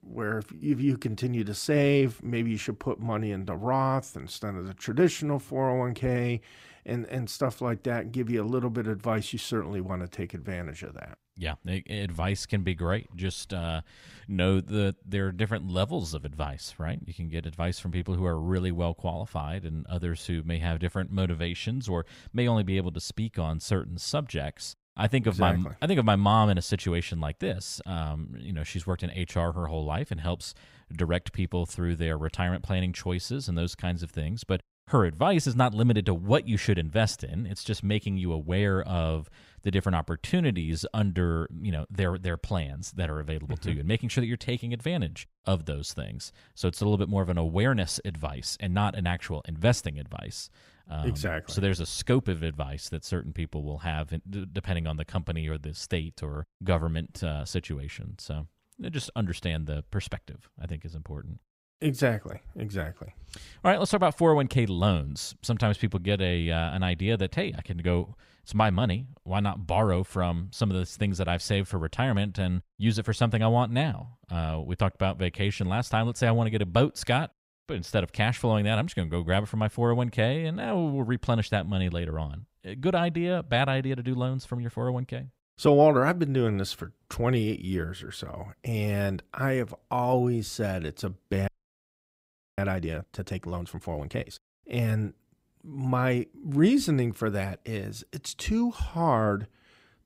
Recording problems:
audio freezing; at 1:31 for 1 s

